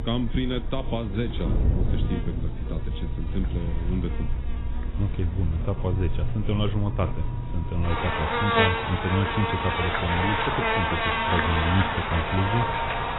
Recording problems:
garbled, watery; badly; nothing above 3.5 kHz
animal sounds; very loud; throughout; 1 dB above the speech
wind noise on the microphone; occasional gusts; 10 dB below the speech

